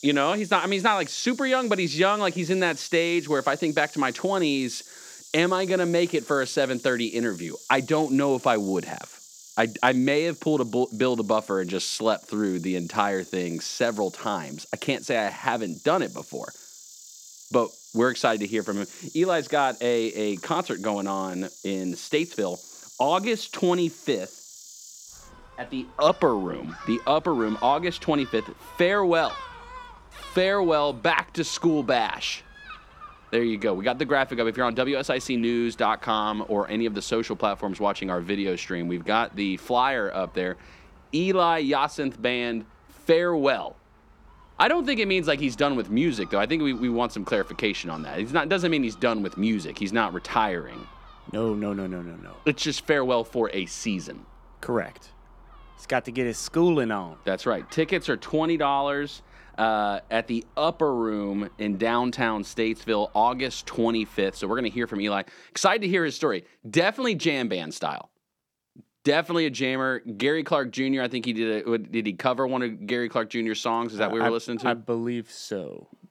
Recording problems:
animal sounds; faint; throughout; 20 dB below the speech

